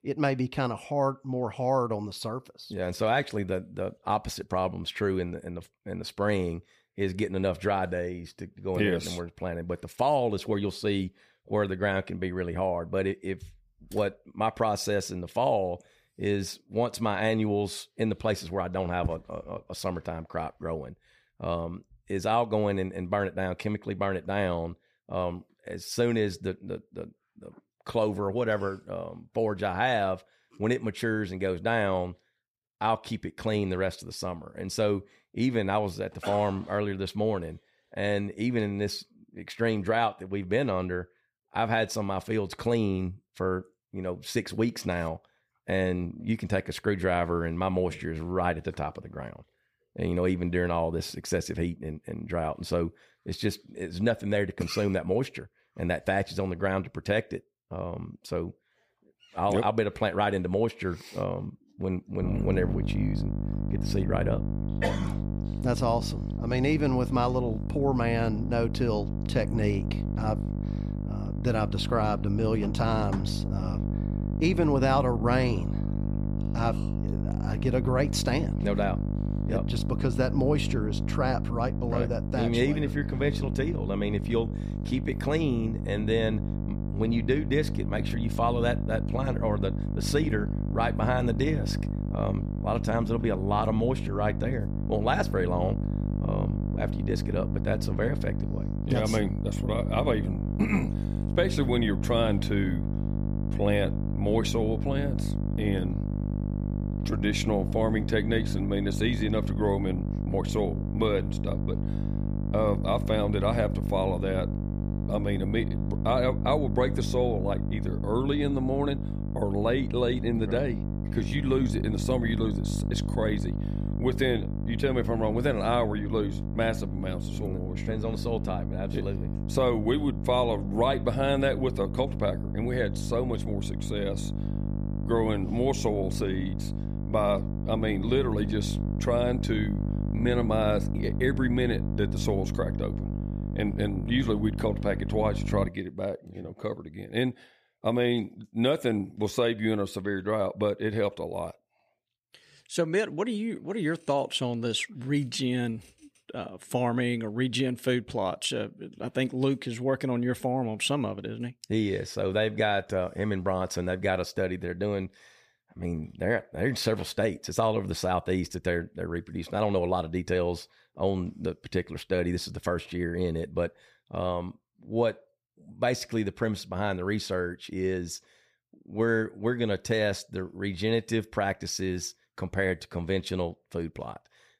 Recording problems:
electrical hum; loud; from 1:02 to 2:26; 50 Hz, 10 dB below the speech

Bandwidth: 15 kHz